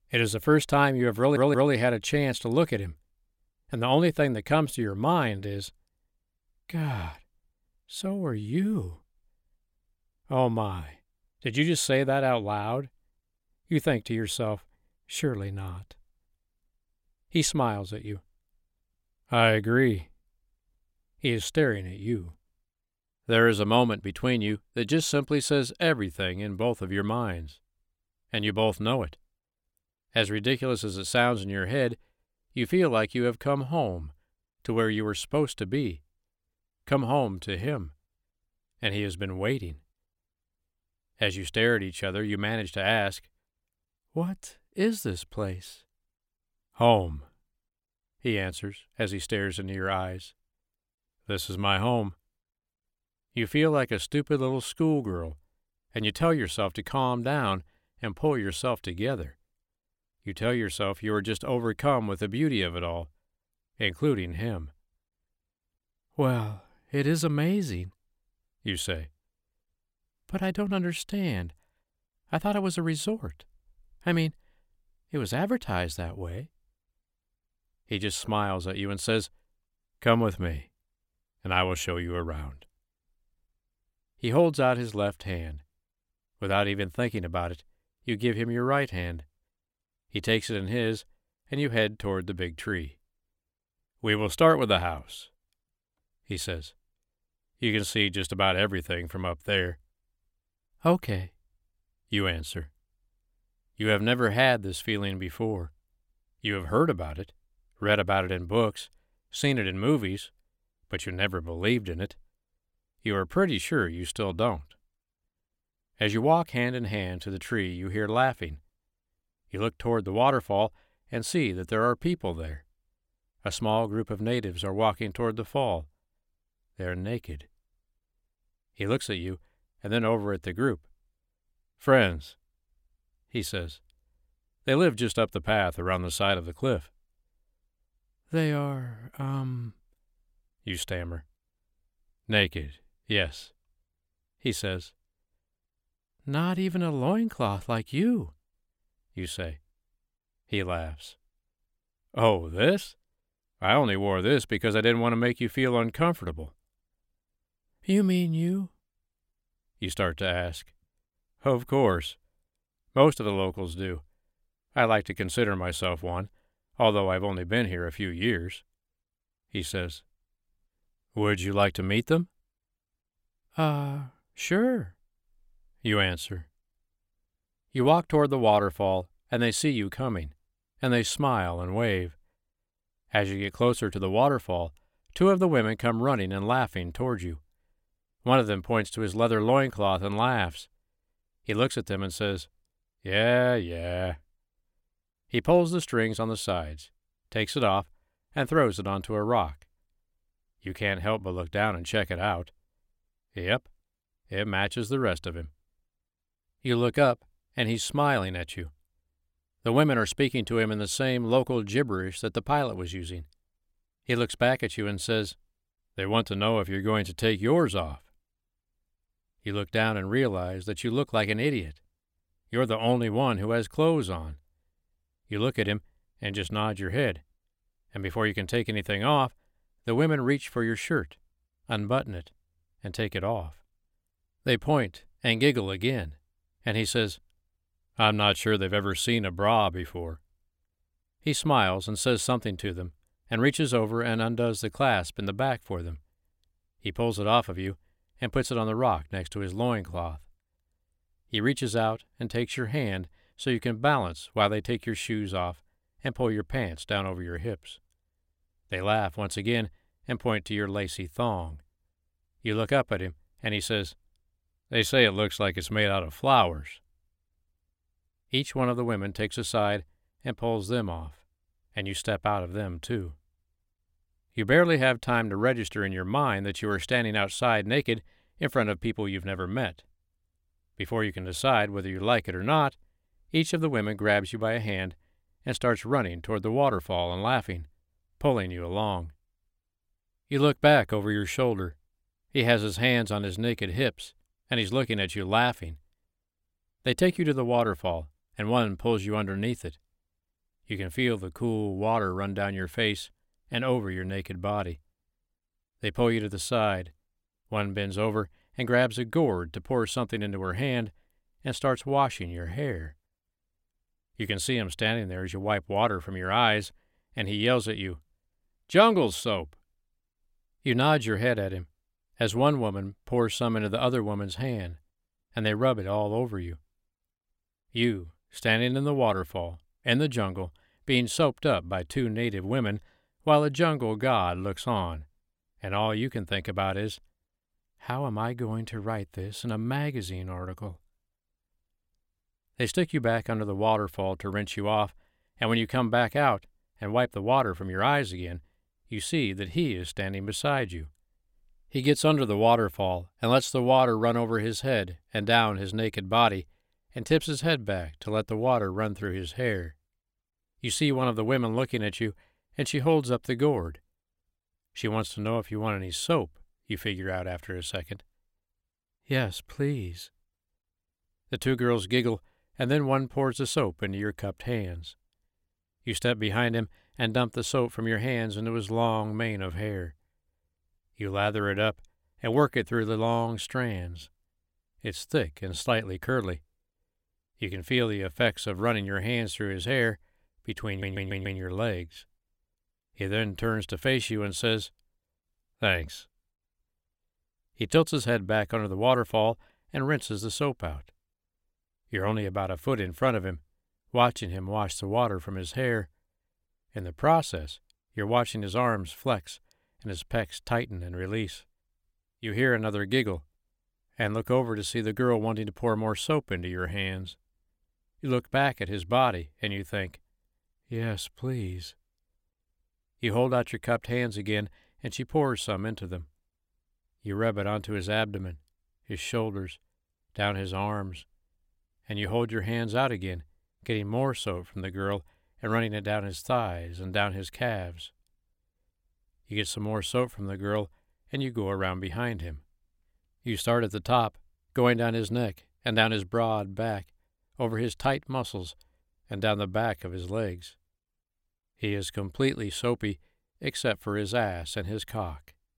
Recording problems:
audio stuttering; at 1 s and at 6:31

